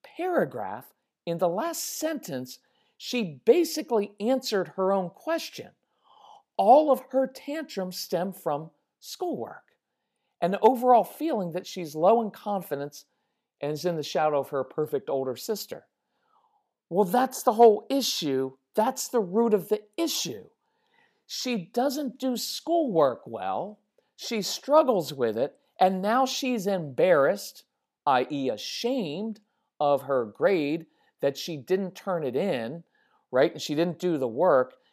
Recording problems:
none

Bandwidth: 14.5 kHz